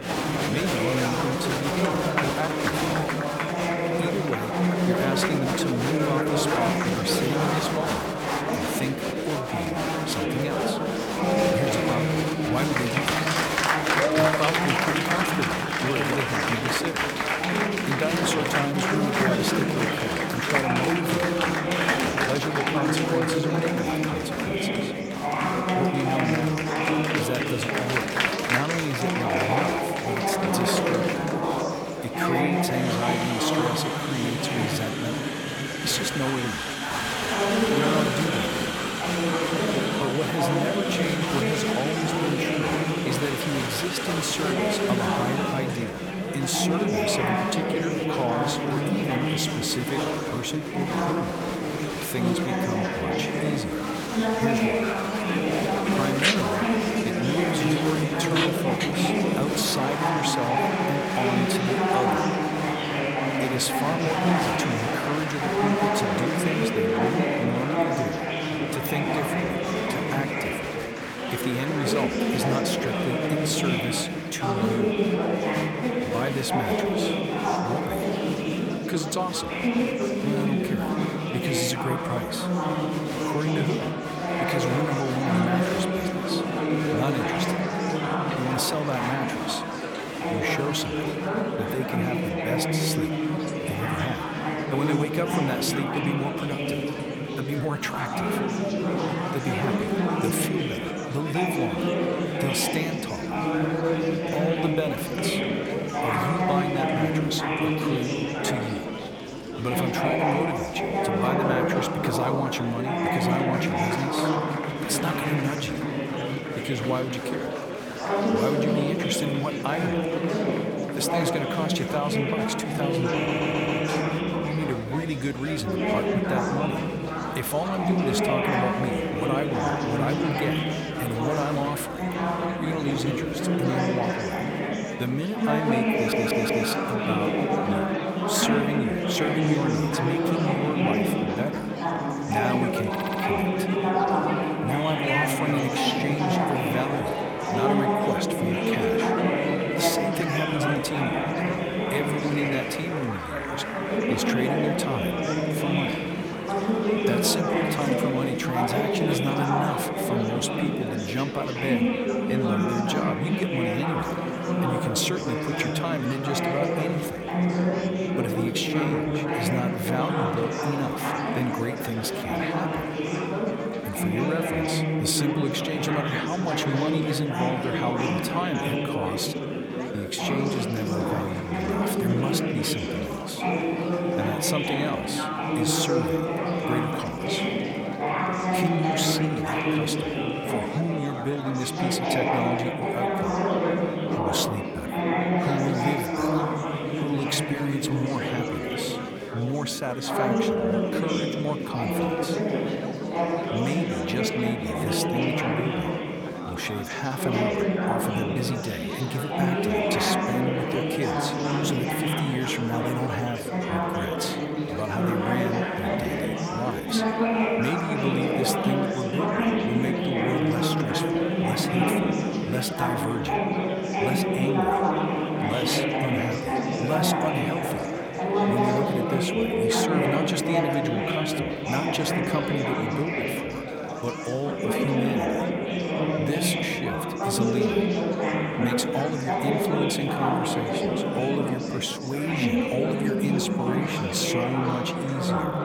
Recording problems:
chatter from many people; very loud; throughout; 4 dB above the speech
background music; noticeable; throughout; 15 dB below the speech
hiss; faint; throughout; 30 dB below the speech
audio stuttering; at 2:03, at 2:16 and at 2:23

